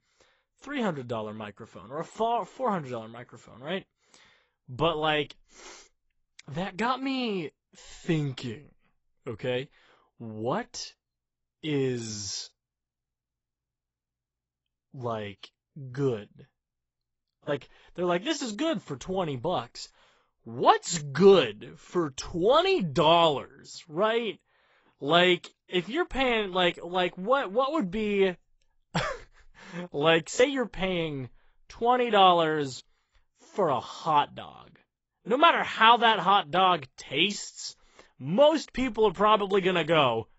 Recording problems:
garbled, watery; badly; nothing above 7.5 kHz

